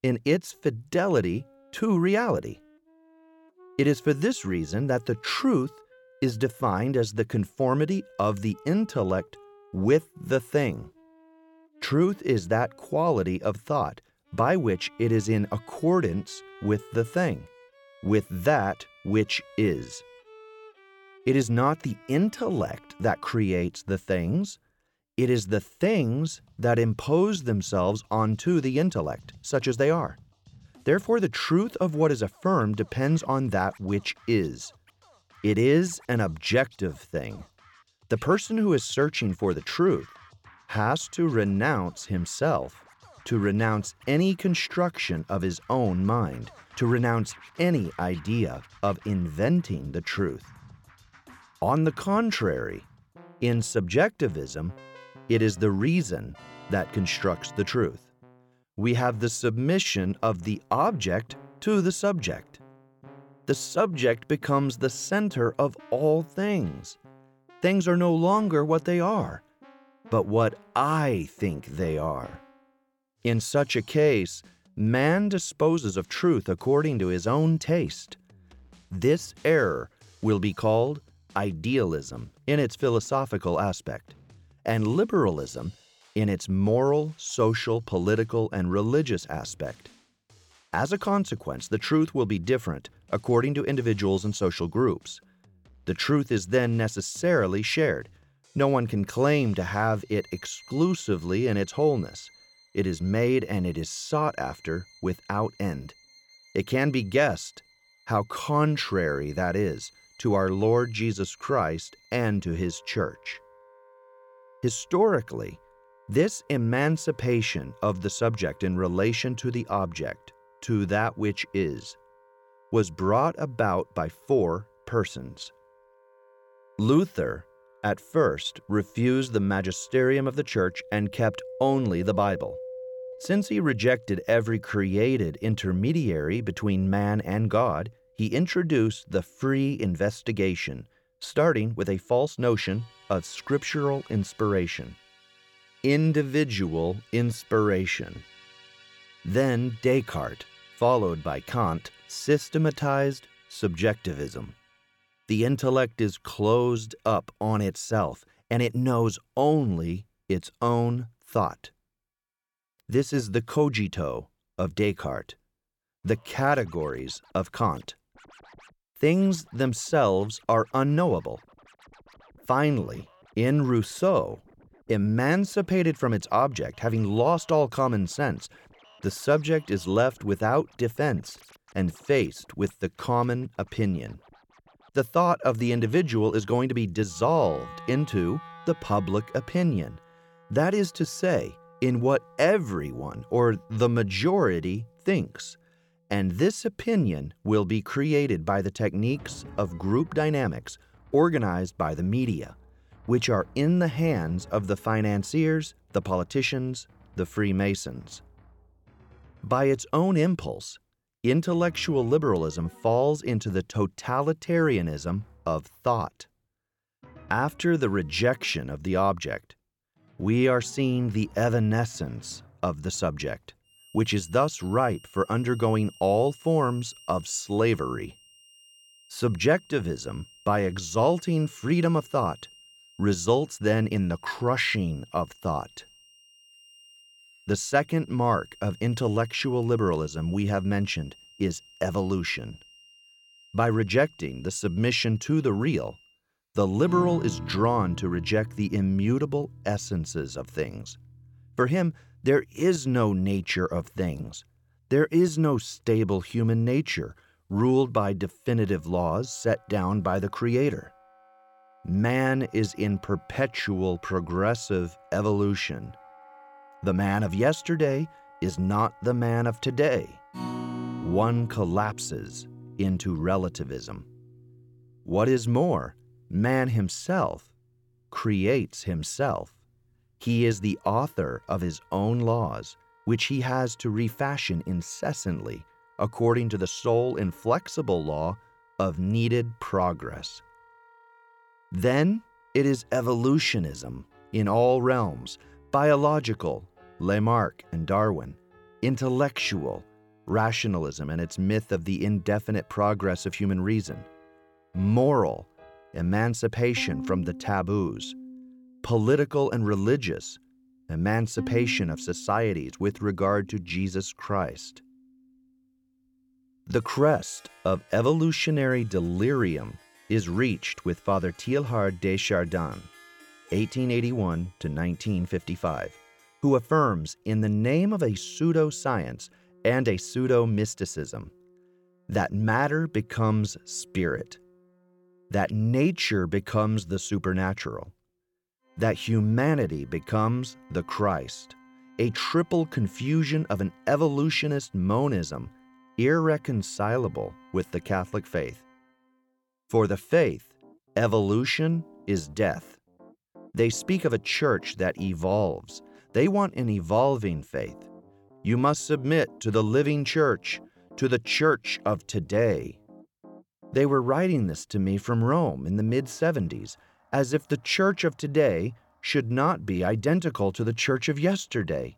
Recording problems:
background music; faint; throughout; 25 dB below the speech

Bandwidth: 17.5 kHz